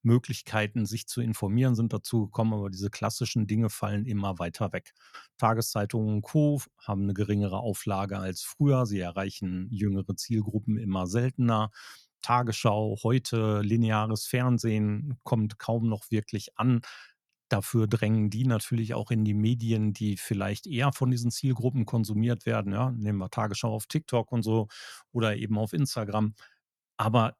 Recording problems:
none

